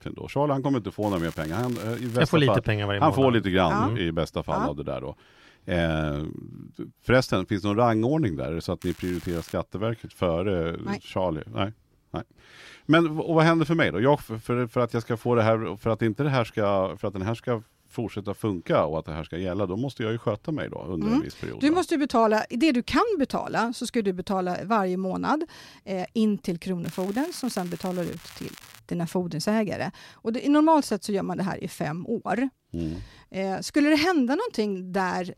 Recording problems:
crackling; noticeable; from 1 to 2 s, at 9 s and from 27 to 29 s; 20 dB below the speech

